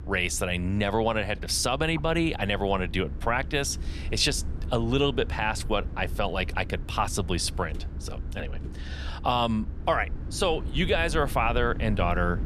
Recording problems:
low rumble; faint; throughout; 20 dB below the speech

